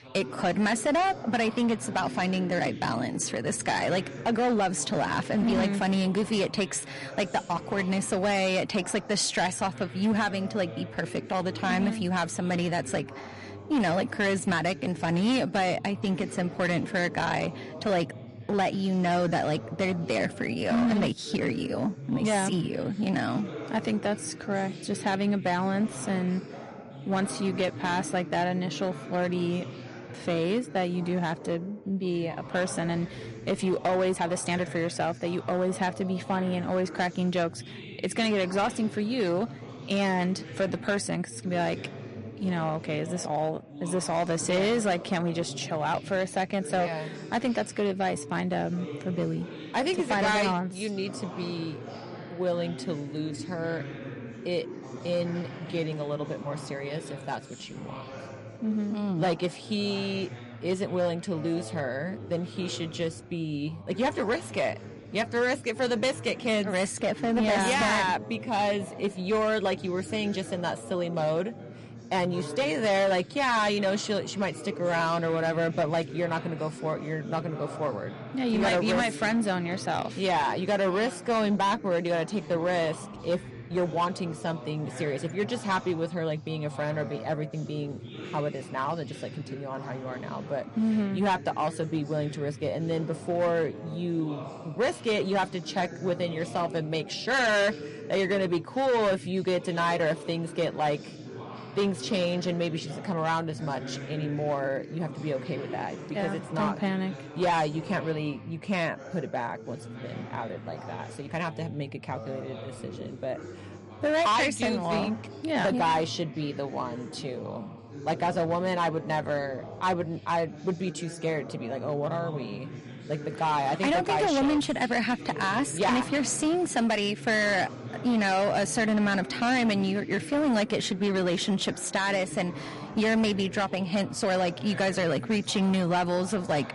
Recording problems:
distortion; slight; 7% of the sound clipped
garbled, watery; slightly; nothing above 11 kHz
background chatter; noticeable; throughout; 2 voices, 15 dB below the speech
uneven, jittery; strongly; from 4 s to 2:16

